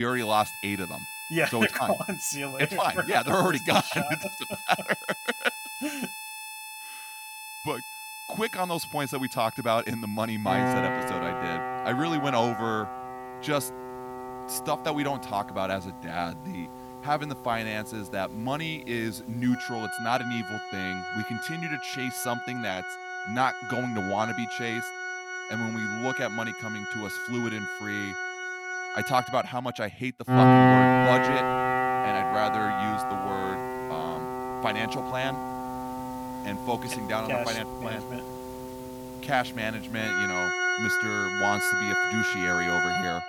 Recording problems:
background music; very loud; throughout; as loud as the speech
abrupt cut into speech; at the start

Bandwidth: 17 kHz